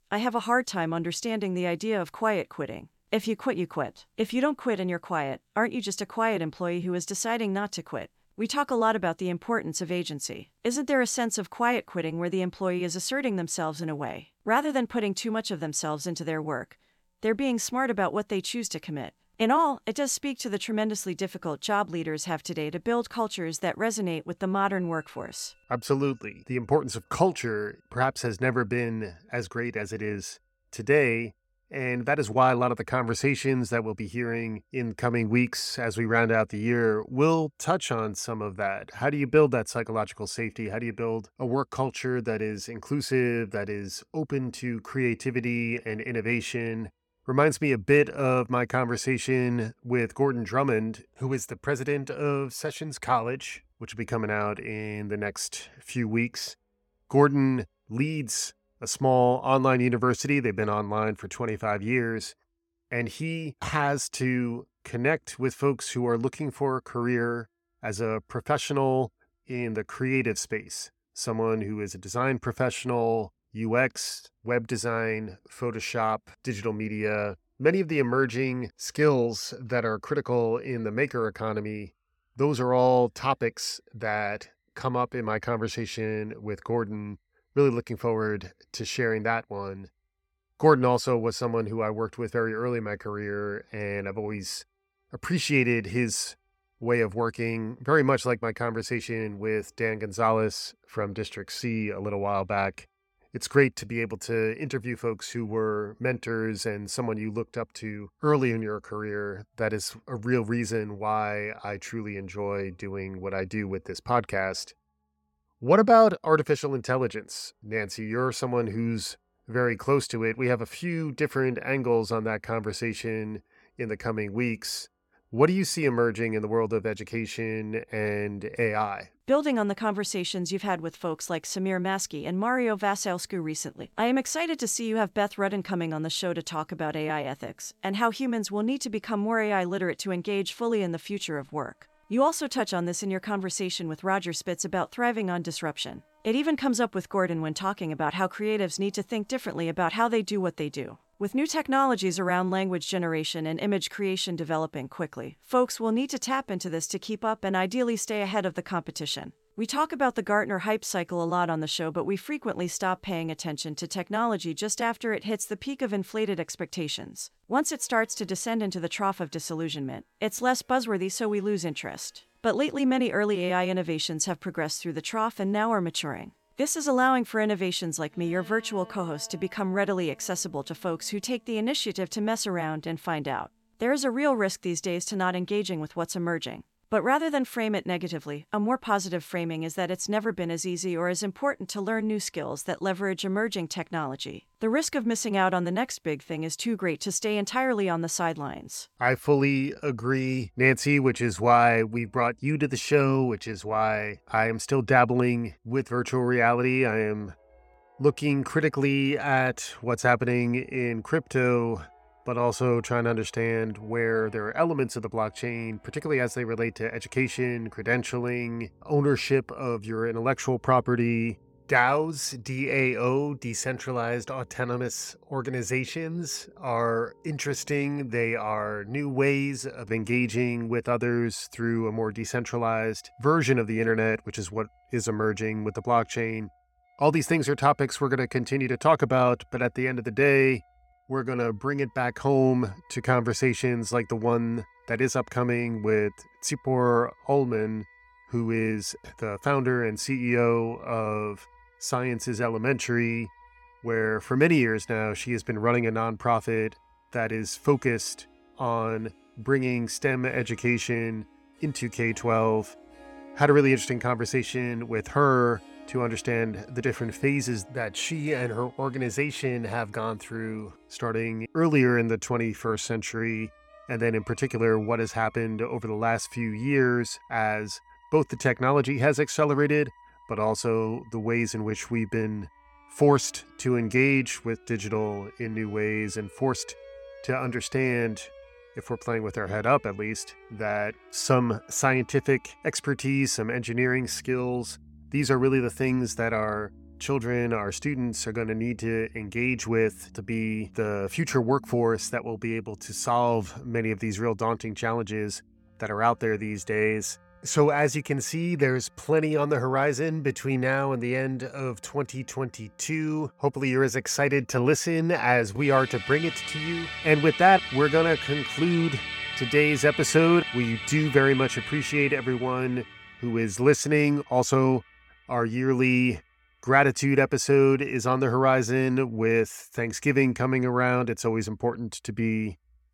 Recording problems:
background music; noticeable; throughout; 15 dB below the speech

